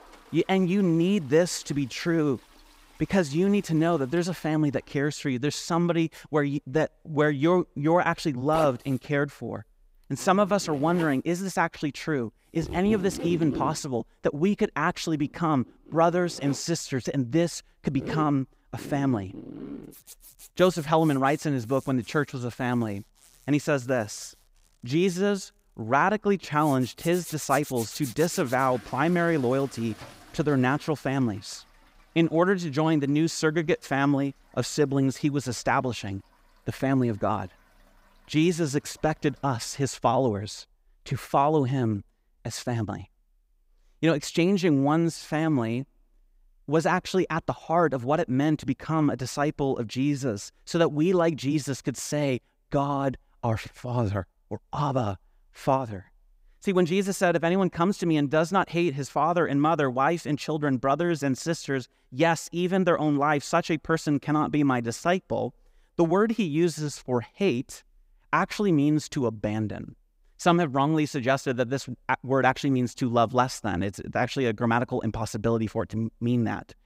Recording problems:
household noises; noticeable; until 40 s; 15 dB below the speech

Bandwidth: 15.5 kHz